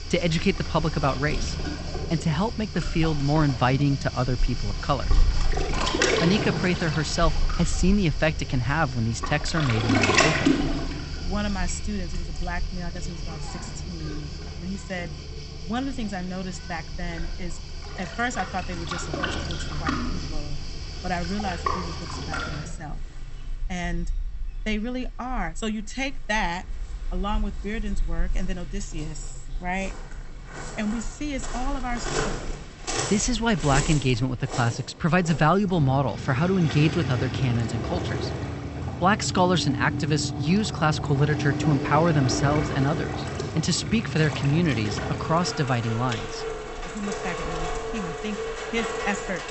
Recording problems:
high frequencies cut off; noticeable; nothing above 8 kHz
rain or running water; loud; throughout; 4 dB below the speech

